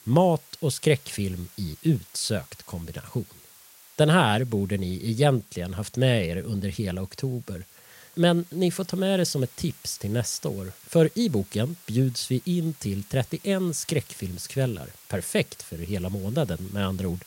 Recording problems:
hiss; faint; throughout; 20 dB below the speech

